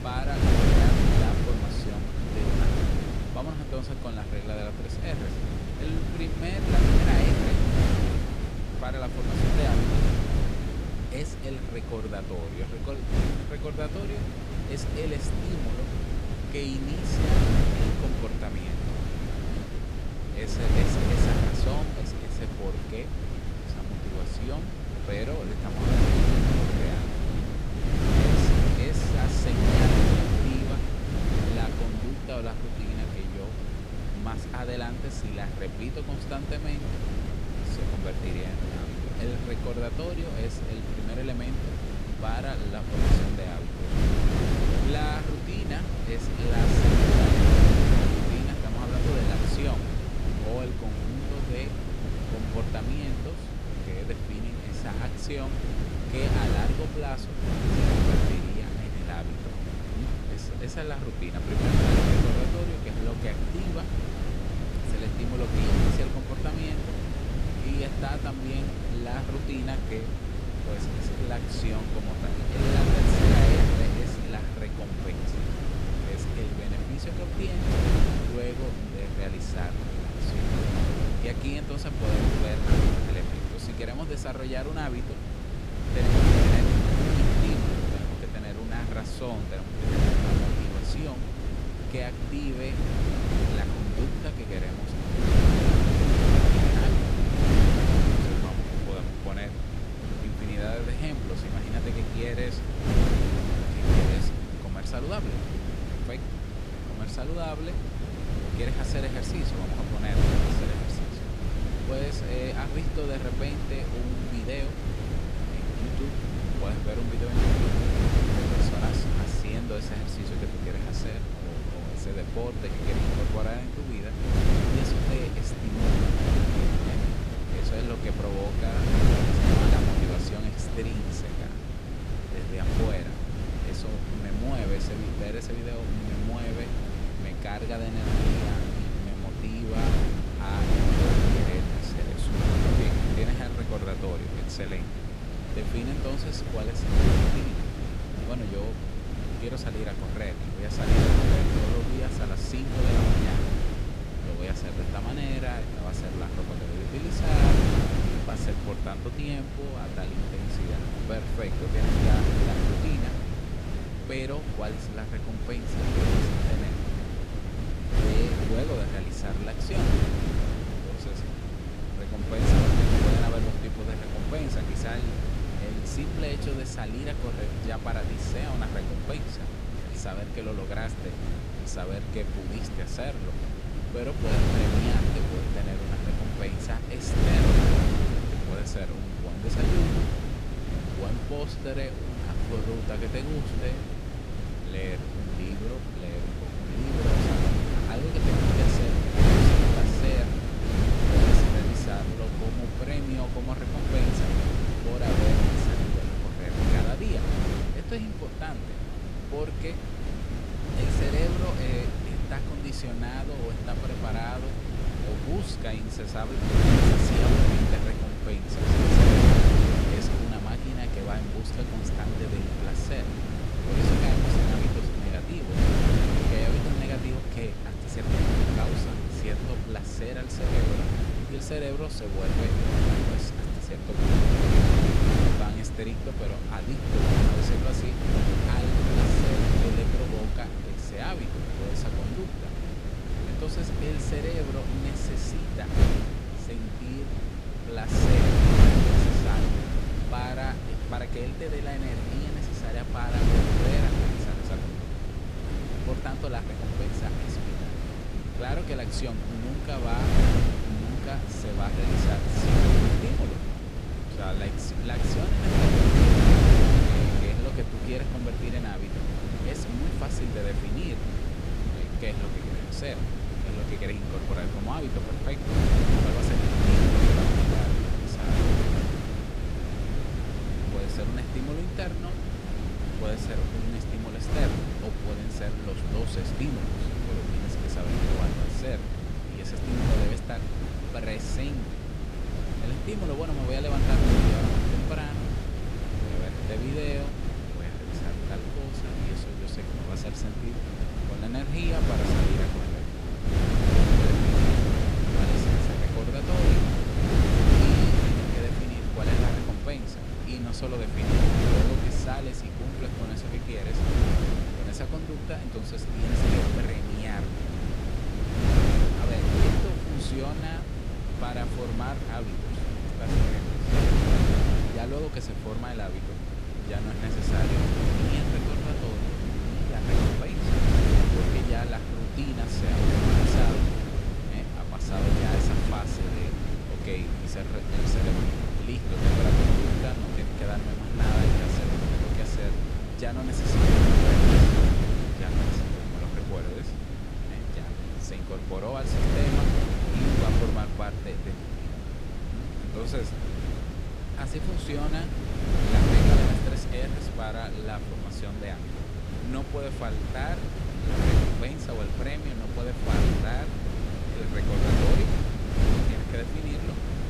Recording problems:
wind noise on the microphone; heavy; 4 dB above the speech

